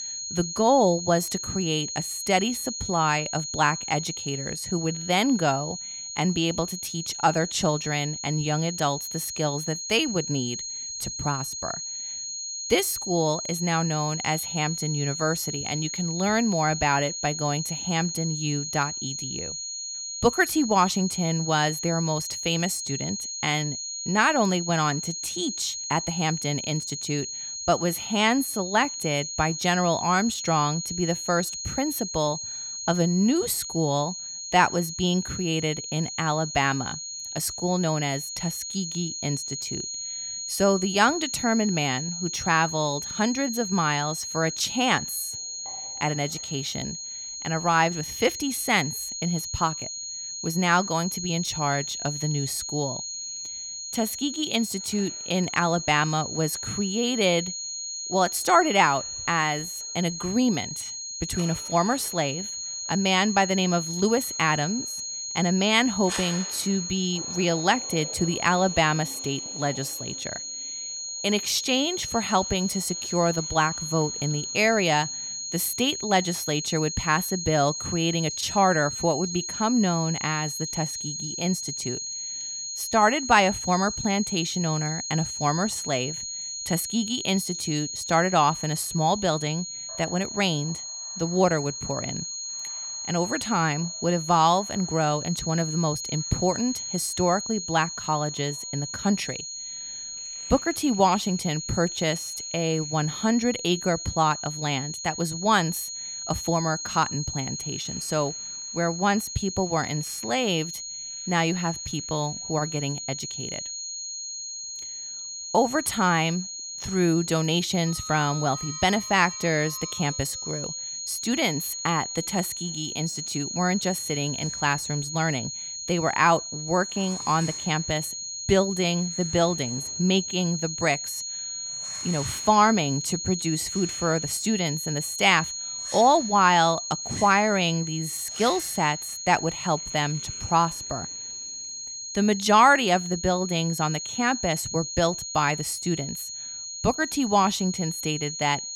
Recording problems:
high-pitched whine; loud; throughout; 6.5 kHz, 6 dB below the speech
household noises; faint; from 45 s on; 25 dB below the speech

